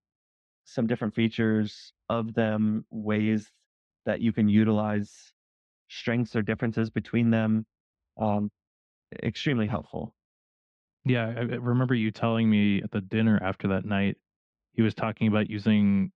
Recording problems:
muffled; slightly; fading above 3.5 kHz

